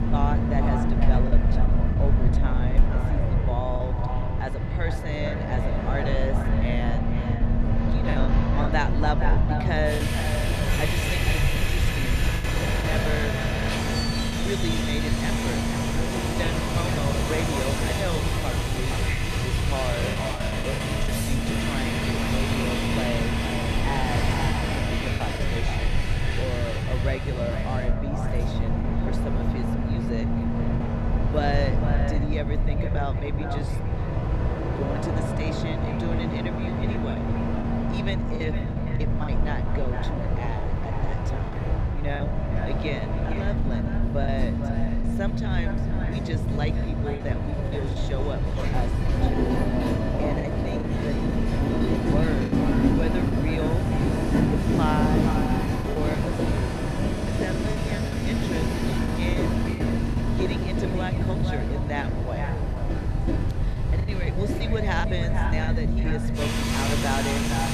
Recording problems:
echo of what is said; strong; throughout; 460 ms later, 8 dB below the speech
train or aircraft noise; very loud; throughout; 4 dB above the speech
low rumble; loud; throughout; 3 dB below the speech
voice in the background; faint; throughout; 25 dB below the speech
choppy; occasionally; 4% of the speech affected

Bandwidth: 14 kHz